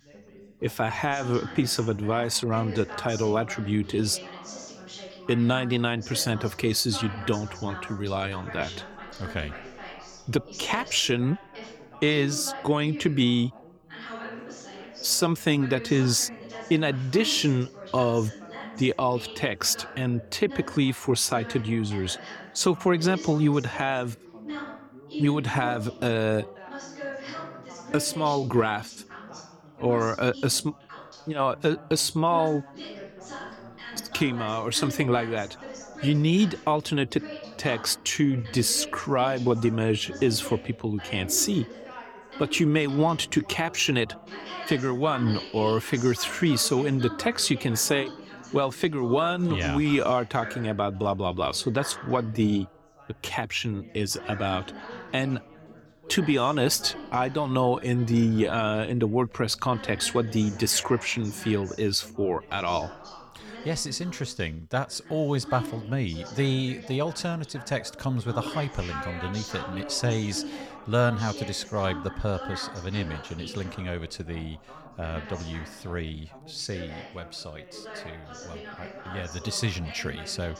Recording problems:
background chatter; noticeable; throughout; 3 voices, 15 dB below the speech

